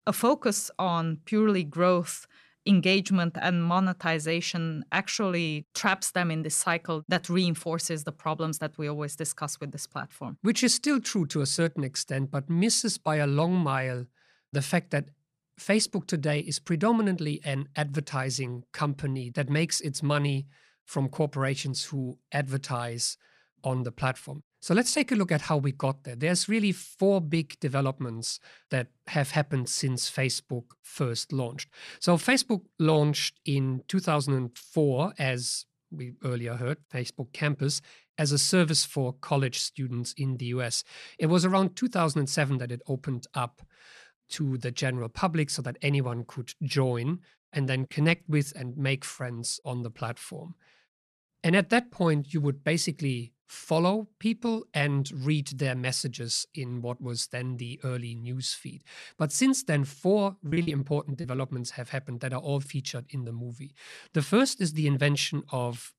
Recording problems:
choppy; very; at 1:00; 17% of the speech affected

